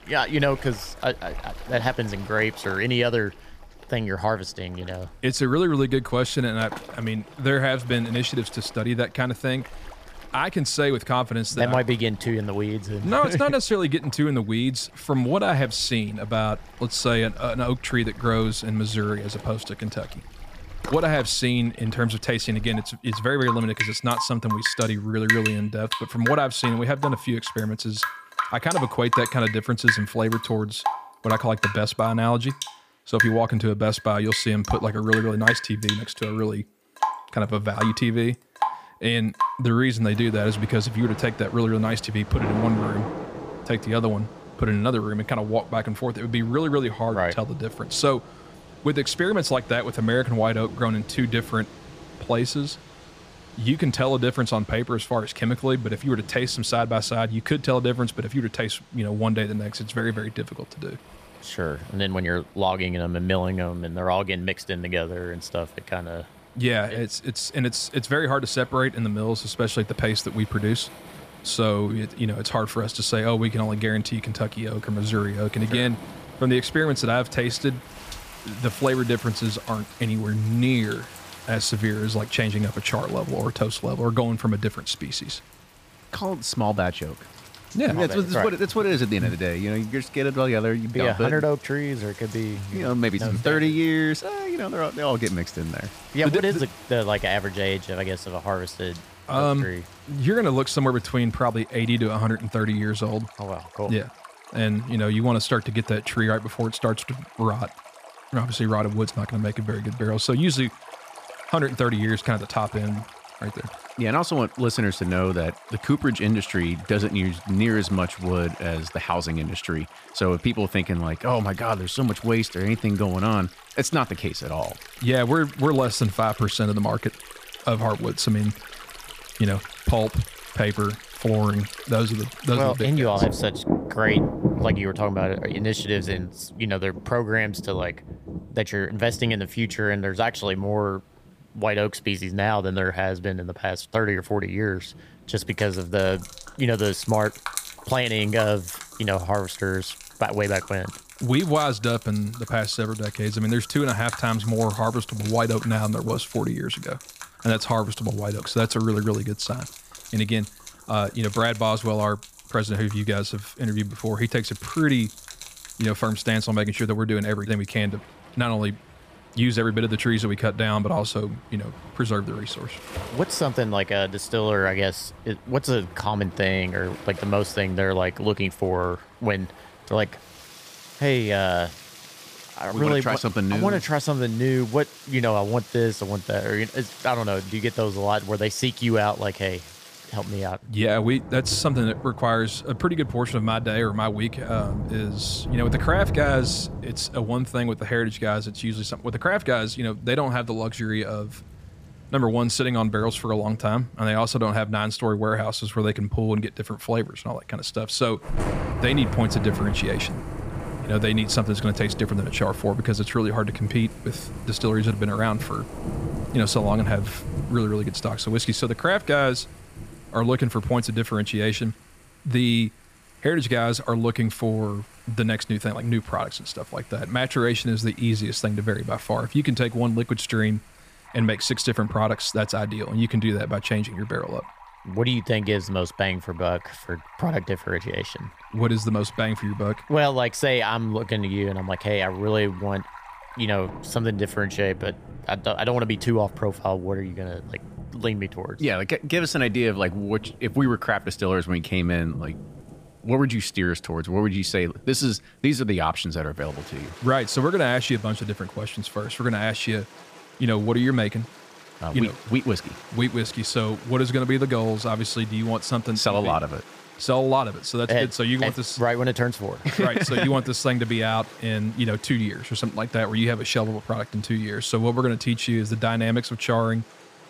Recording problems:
rain or running water; noticeable; throughout; 10 dB below the speech

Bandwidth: 15 kHz